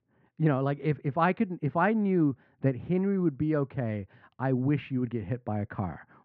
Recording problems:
muffled; very; fading above 2 kHz

